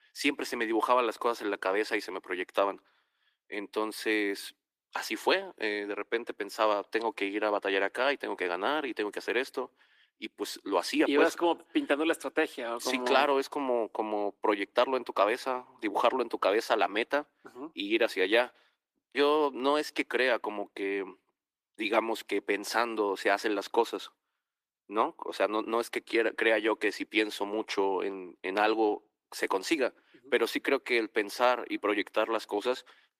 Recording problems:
thin; somewhat; fading below 300 Hz
garbled, watery; slightly; nothing above 14.5 kHz

